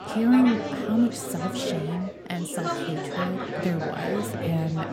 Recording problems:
chatter from many people; loud; throughout; 4 dB below the speech

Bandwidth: 16.5 kHz